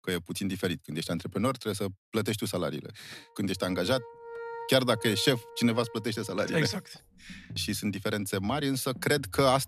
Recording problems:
background music; noticeable; from 4 s on; 15 dB below the speech

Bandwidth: 14 kHz